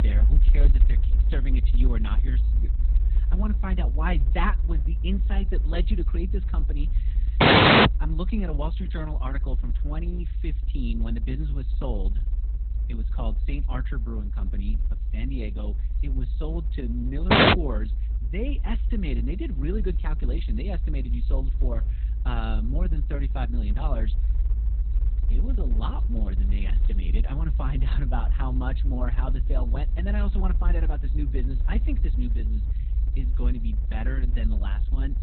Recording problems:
garbled, watery; badly; nothing above 4 kHz
low rumble; noticeable; throughout; 10 dB below the speech
audio cutting out; at 7.5 s and at 17 s

